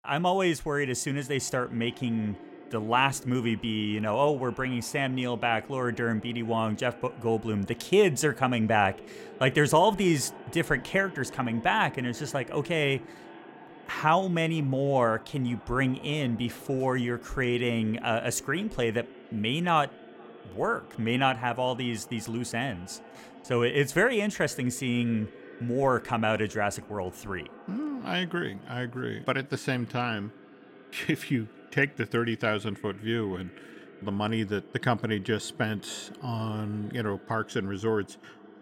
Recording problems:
echo of what is said; faint; throughout; 470 ms later, 20 dB below the speech

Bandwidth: 16.5 kHz